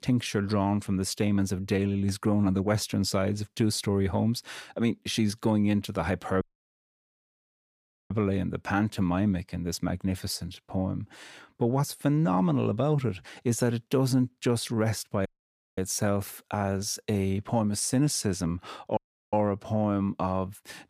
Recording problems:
audio cutting out; at 6.5 s for 1.5 s, at 15 s for 0.5 s and at 19 s

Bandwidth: 15 kHz